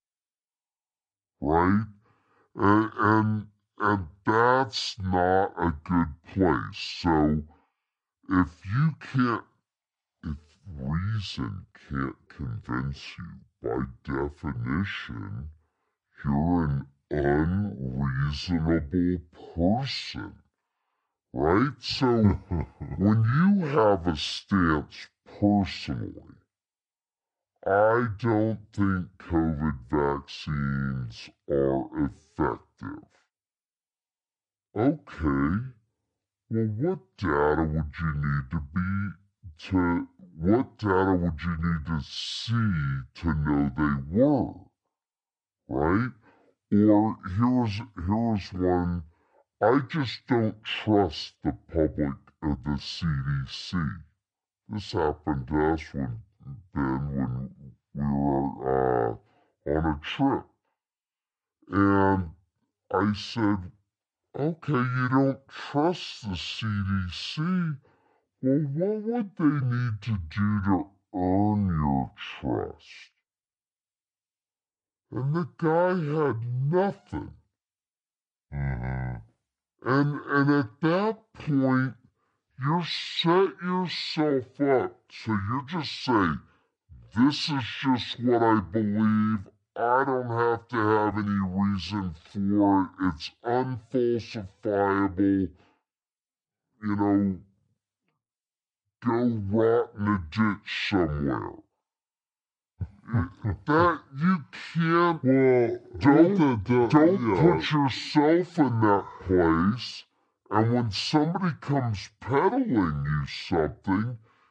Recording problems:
wrong speed and pitch; too slow and too low; 0.6 times normal speed
uneven, jittery; slightly; from 12 s to 1:37

